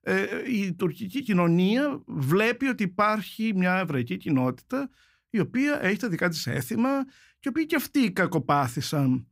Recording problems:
none

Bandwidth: 15.5 kHz